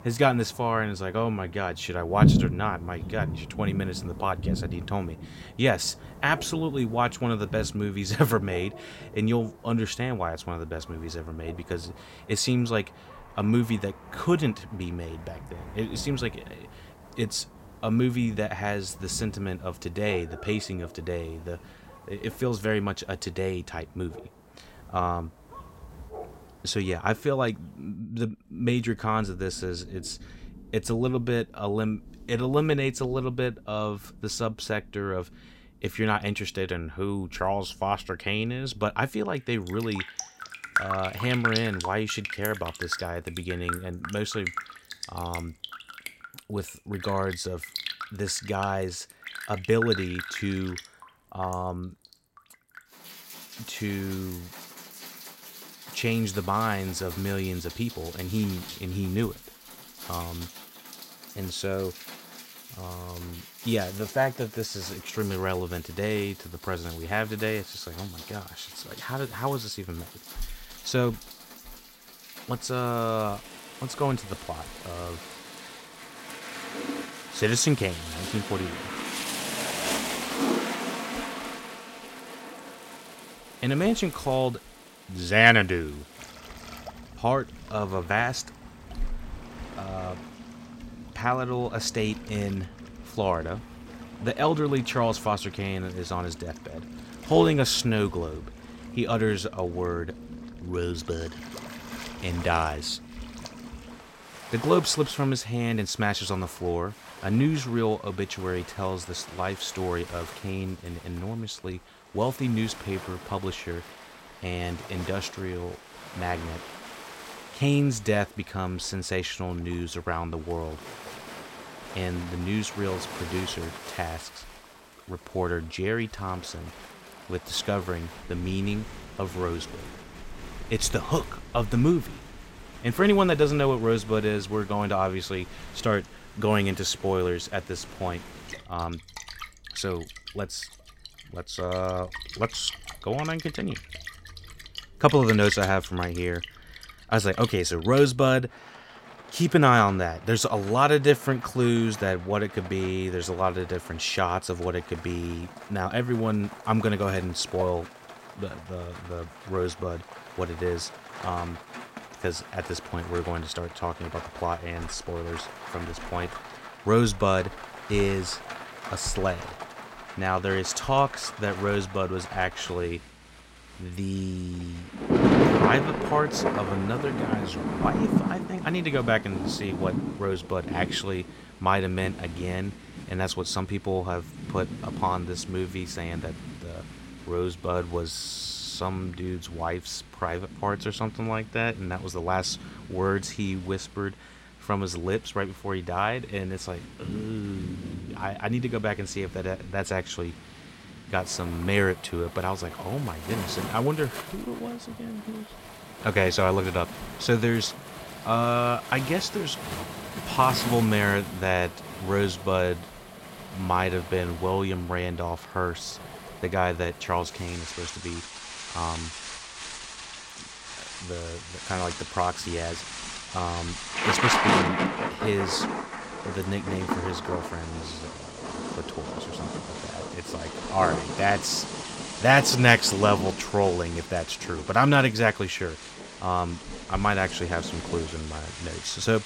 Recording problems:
rain or running water; loud; throughout; 8 dB below the speech

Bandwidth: 16 kHz